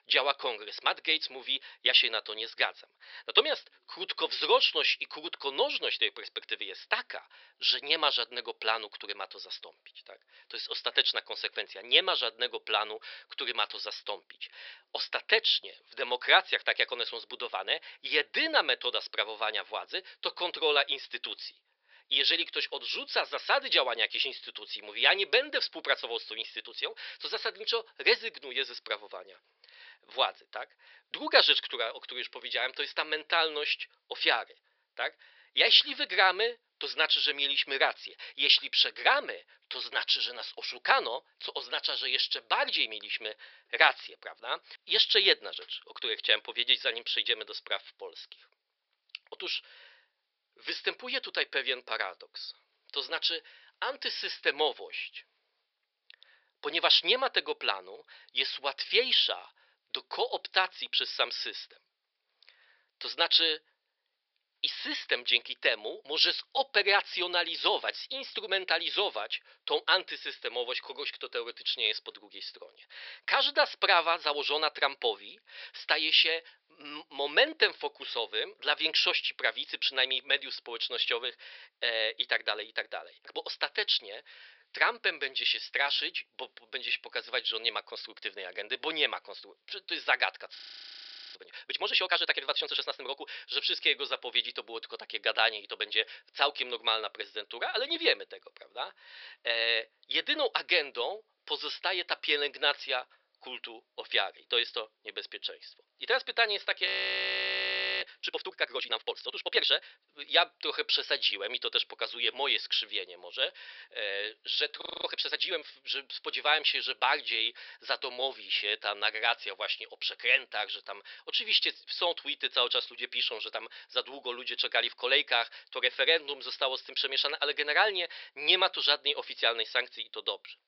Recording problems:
thin; very; fading below 450 Hz
high frequencies cut off; noticeable; nothing above 5.5 kHz
audio freezing; at 1:31 for 1 s, at 1:47 for 1 s and at 1:55

